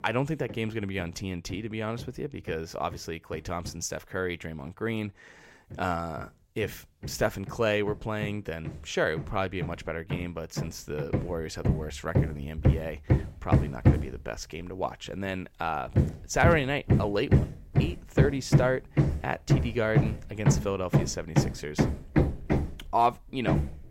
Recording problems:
machinery noise; very loud; throughout; 3 dB above the speech

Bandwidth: 16 kHz